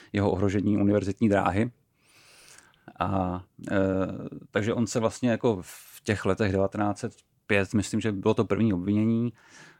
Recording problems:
none

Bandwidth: 17 kHz